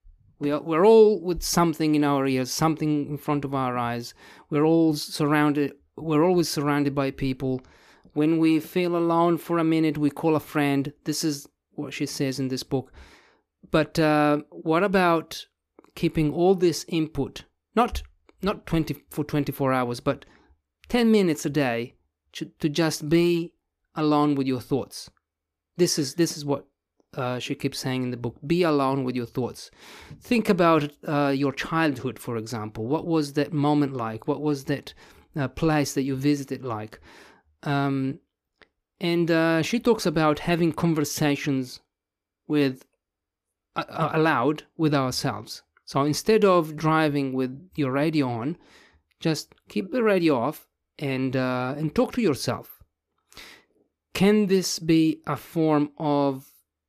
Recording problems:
none

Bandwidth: 14.5 kHz